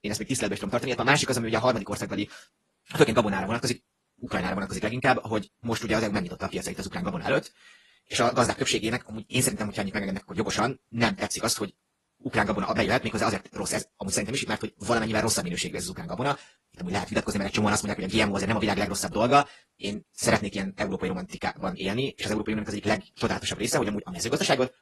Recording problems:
wrong speed, natural pitch; too fast; 1.6 times normal speed
garbled, watery; slightly; nothing above 11.5 kHz

